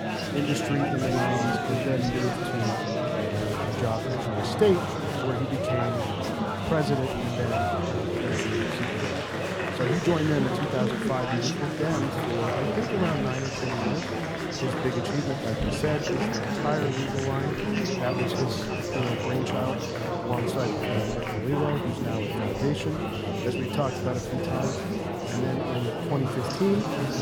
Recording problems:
murmuring crowd; very loud; throughout; 2 dB above the speech
machinery noise; noticeable; throughout; 15 dB below the speech
dog barking; noticeable; at 18 s; peak 7 dB below the speech

